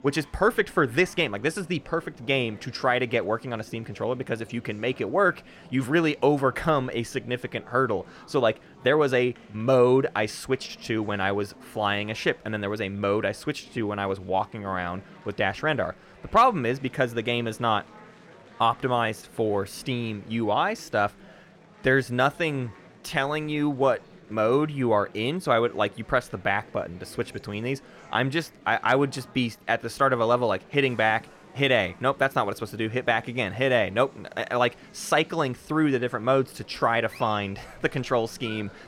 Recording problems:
murmuring crowd; faint; throughout; 25 dB below the speech

